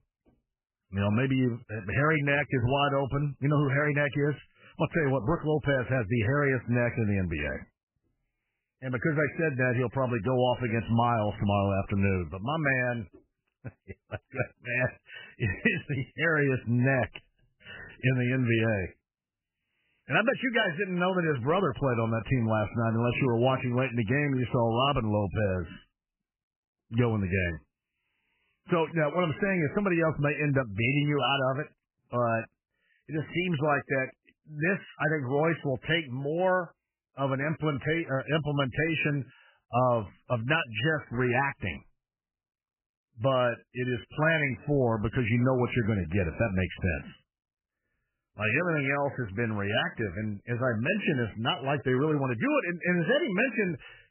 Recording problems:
garbled, watery; badly; nothing above 3 kHz

